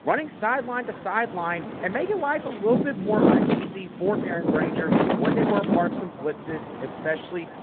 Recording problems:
echo of what is said; faint; throughout; 420 ms later, 20 dB below the speech
phone-call audio
wind in the background; very loud; throughout; 3 dB above the speech

